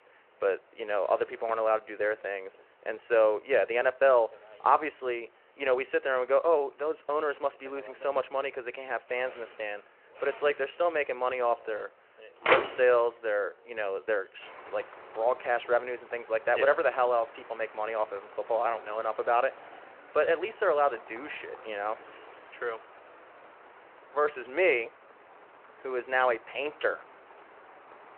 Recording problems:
phone-call audio
traffic noise; noticeable; throughout; 10 dB below the speech

